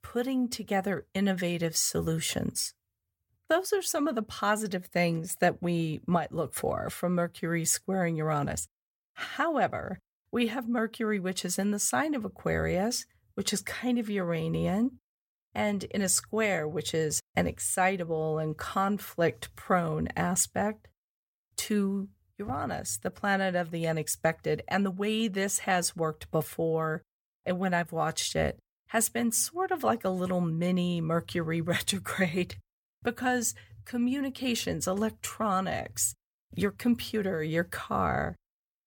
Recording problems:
none

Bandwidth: 17.5 kHz